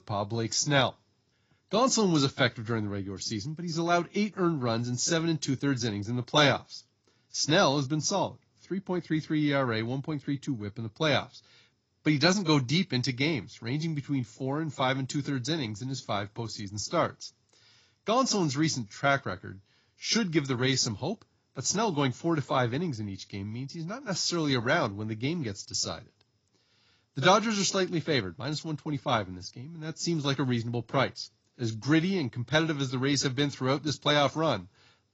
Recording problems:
garbled, watery; badly; nothing above 7 kHz

